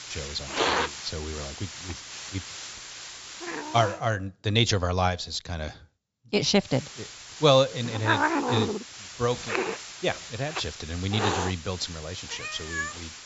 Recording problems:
high frequencies cut off; noticeable; nothing above 8 kHz
hiss; loud; until 4 s and from 6.5 s on; 4 dB below the speech

